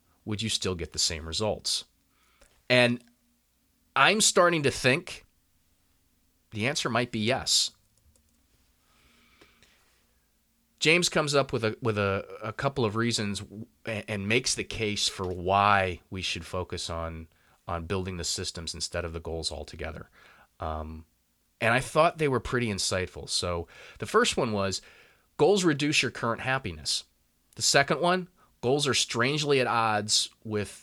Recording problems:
none

